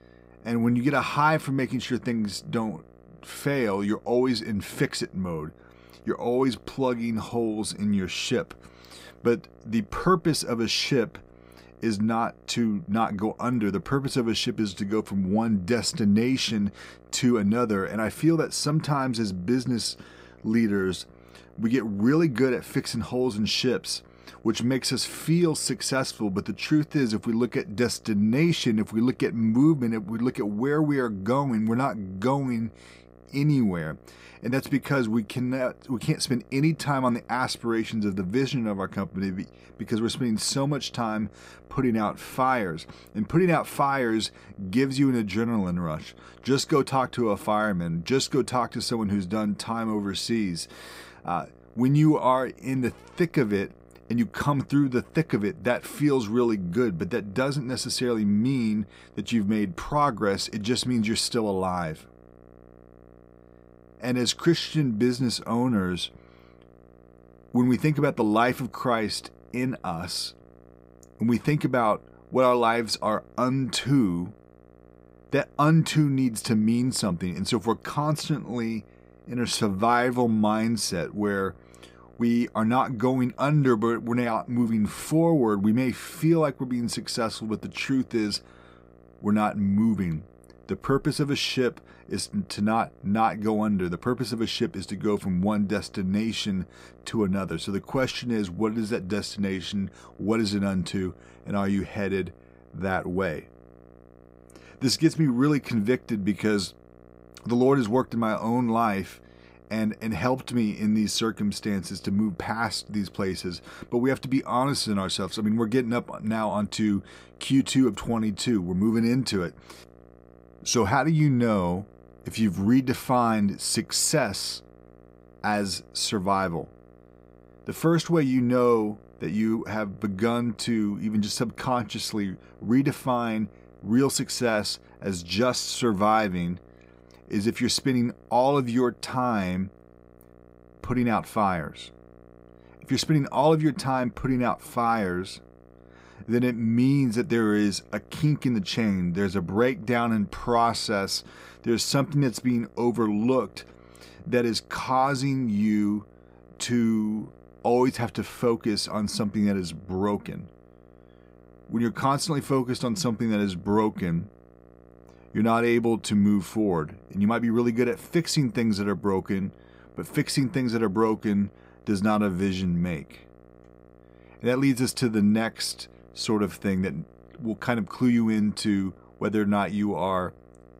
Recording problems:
electrical hum; faint; throughout; 60 Hz, 30 dB below the speech

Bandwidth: 15.5 kHz